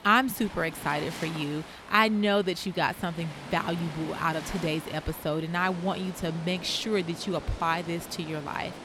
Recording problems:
rain or running water; noticeable; throughout; 15 dB below the speech

